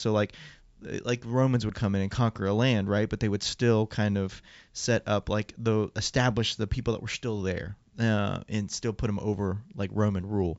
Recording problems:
high frequencies cut off; noticeable; nothing above 8 kHz
abrupt cut into speech; at the start

